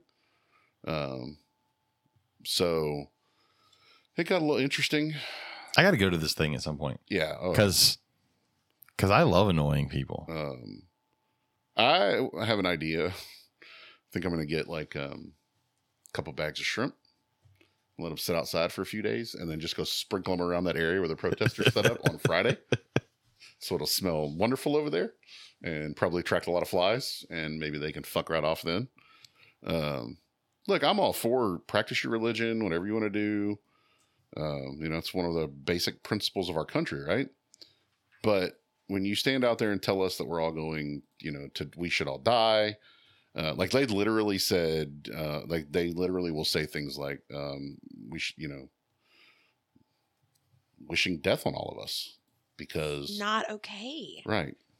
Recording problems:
none

